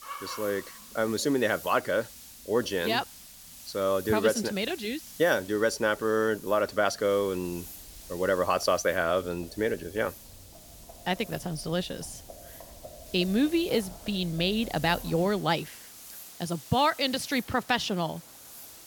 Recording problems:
hiss; noticeable; throughout; 15 dB below the speech
animal sounds; faint; throughout; 25 dB below the speech

